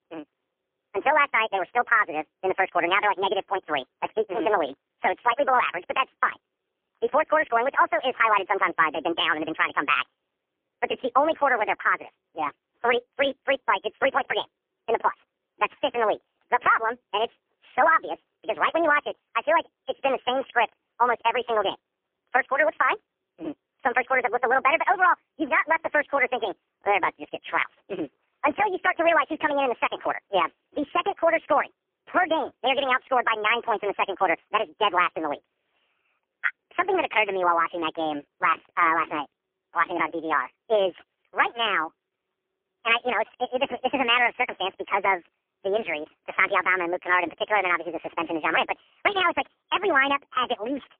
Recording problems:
phone-call audio; poor line; nothing above 3.5 kHz
wrong speed and pitch; too fast and too high; 1.6 times normal speed

